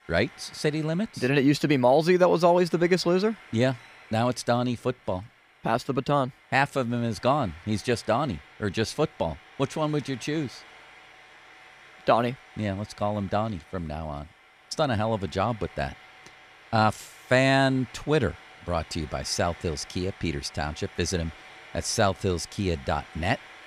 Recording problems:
household noises; faint; throughout; 20 dB below the speech

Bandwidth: 15 kHz